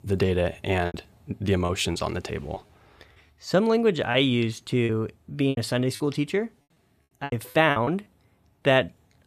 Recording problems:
choppy; very; from 0.5 to 2.5 s and from 4 to 8 s; 11% of the speech affected

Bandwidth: 14.5 kHz